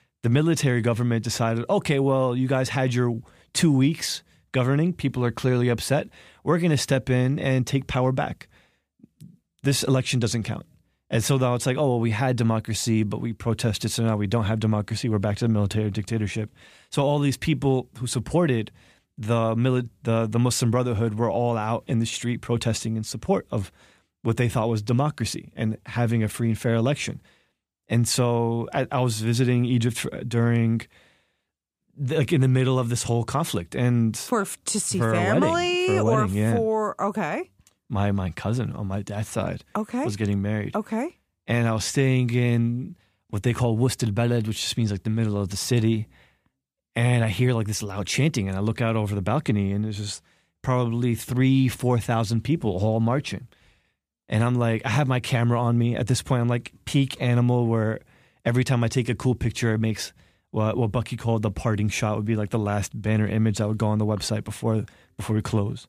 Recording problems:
none

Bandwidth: 15 kHz